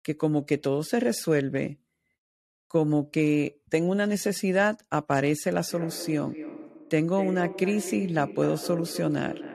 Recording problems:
echo of what is said; strong; from 5.5 s on; 250 ms later, 10 dB below the speech

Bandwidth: 14 kHz